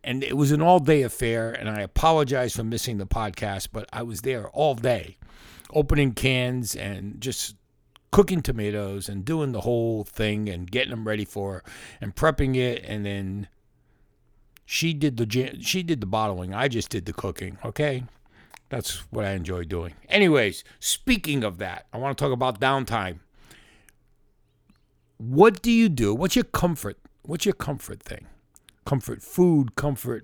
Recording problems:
none

